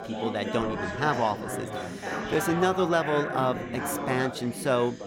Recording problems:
chatter from many people; loud; throughout; 5 dB below the speech

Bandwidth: 17 kHz